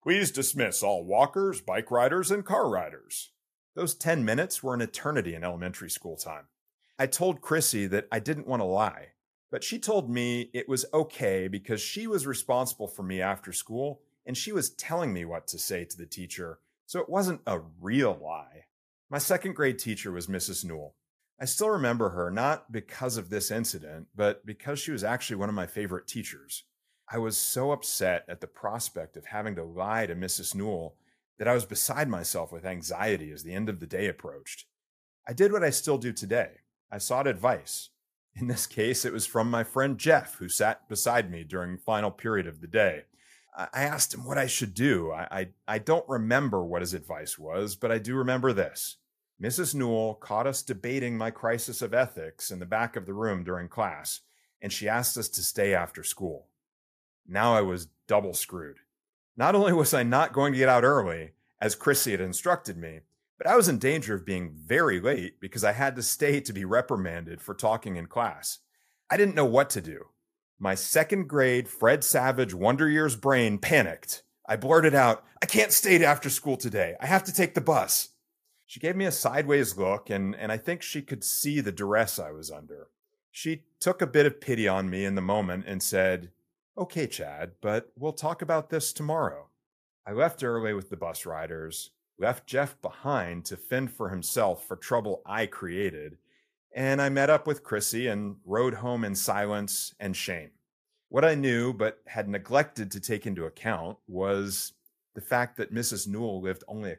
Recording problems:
none

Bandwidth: 14.5 kHz